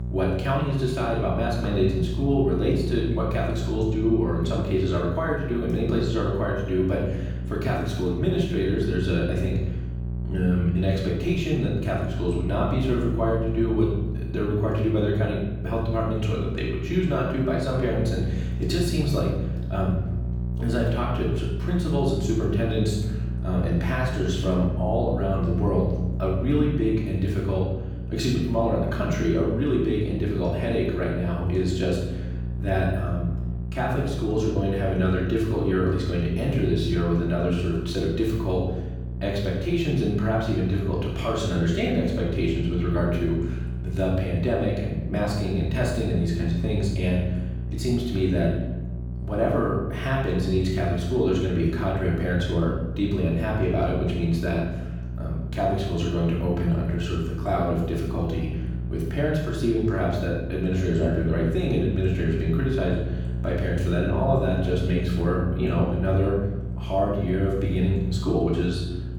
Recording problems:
off-mic speech; far
room echo; noticeable; dies away in 1.1 s
electrical hum; noticeable; throughout; 60 Hz, 15 dB below the speech

